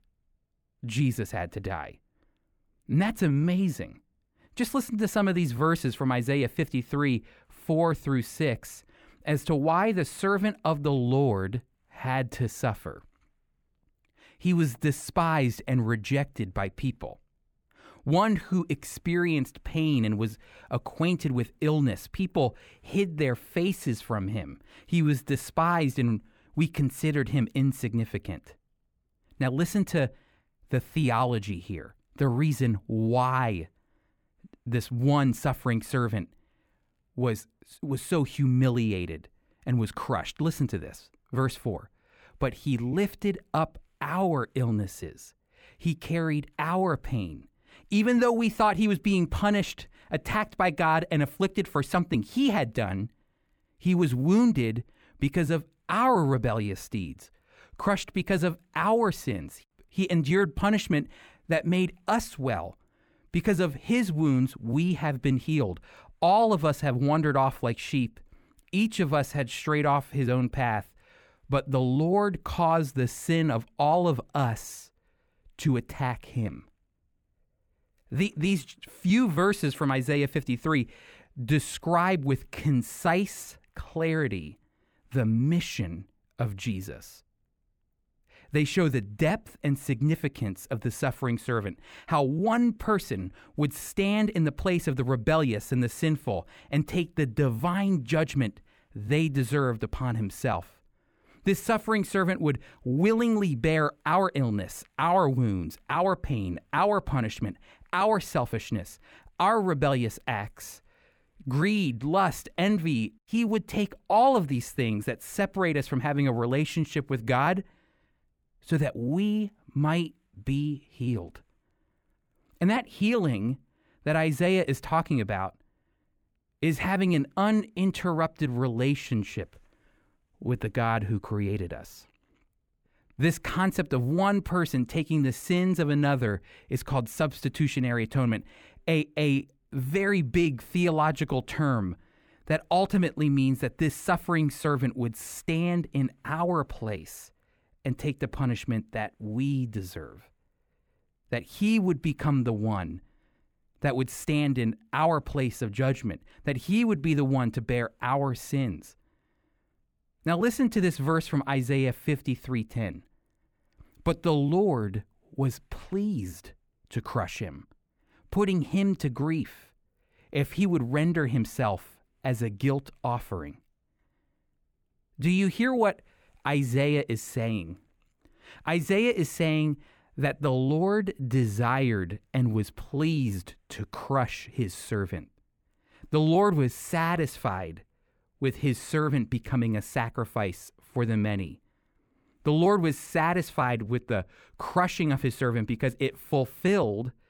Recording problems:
muffled; slightly; fading above 2.5 kHz

